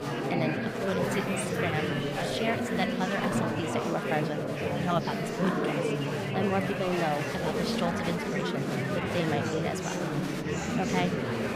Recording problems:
chatter from many people; very loud; throughout; 3 dB above the speech

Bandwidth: 15 kHz